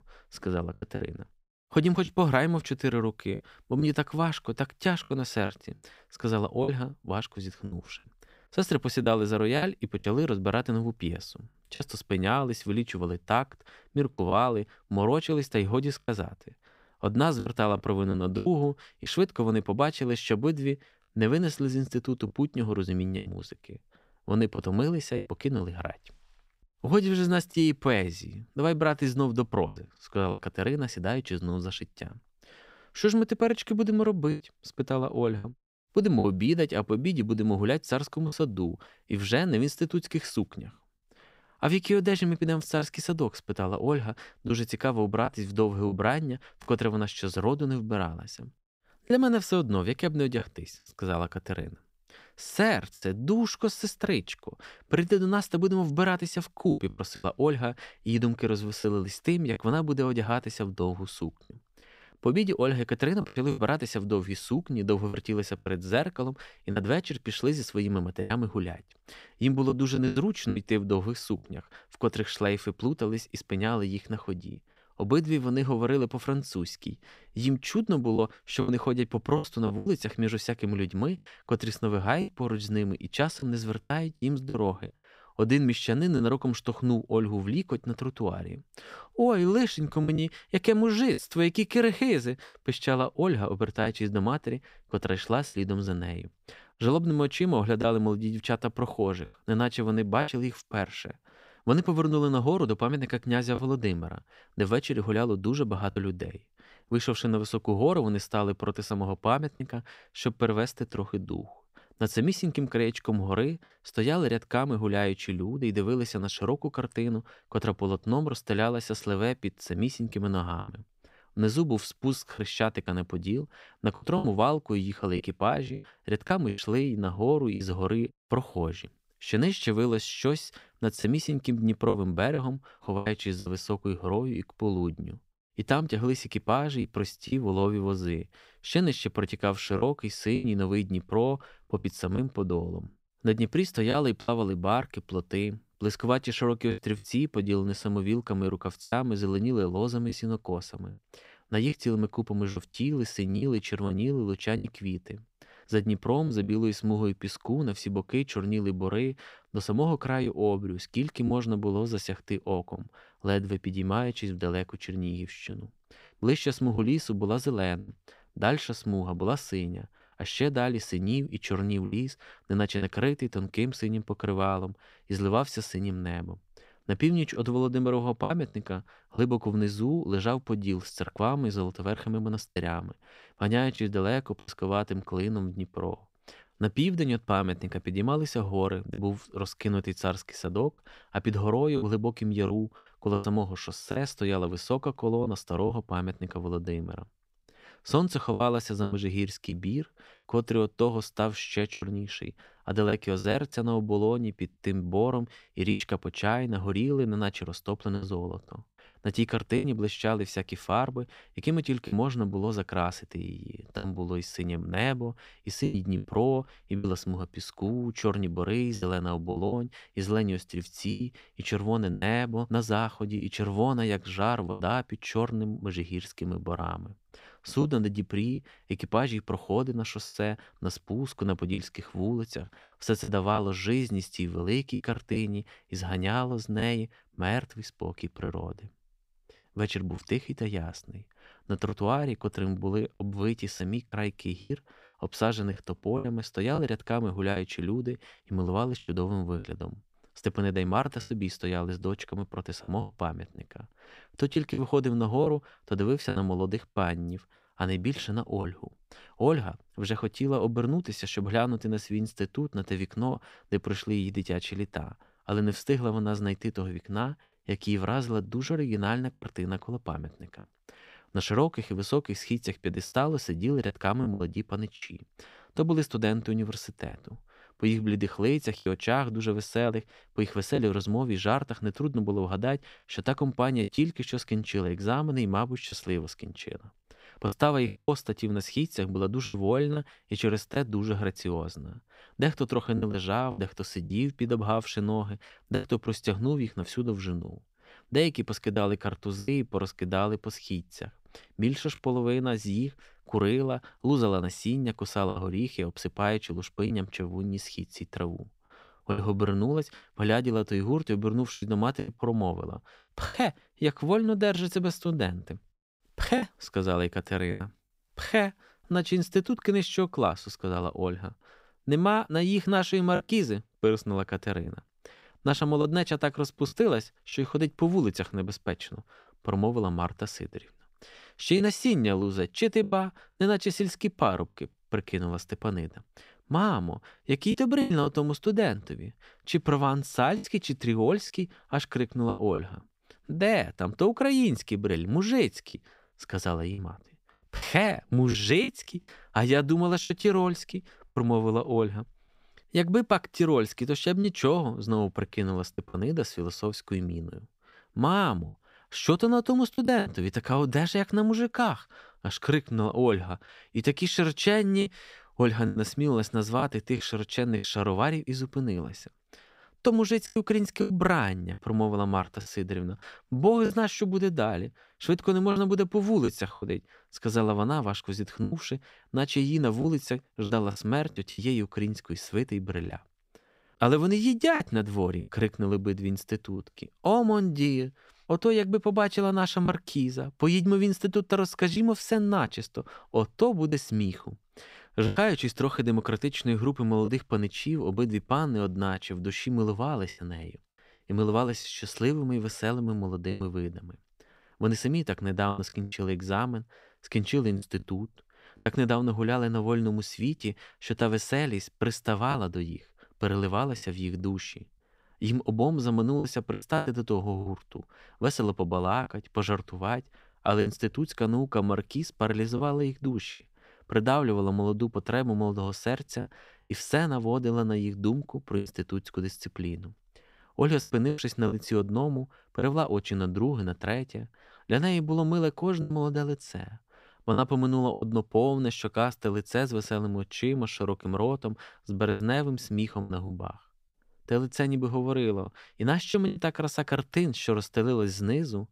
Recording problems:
choppy; occasionally; 4% of the speech affected

